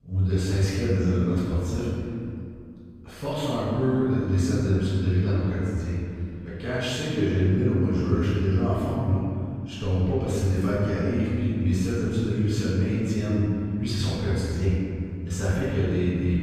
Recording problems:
room echo; strong; dies away in 2.3 s
off-mic speech; far

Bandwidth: 15 kHz